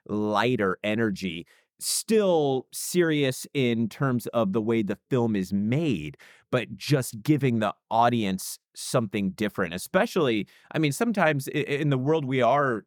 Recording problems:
none

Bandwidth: 18.5 kHz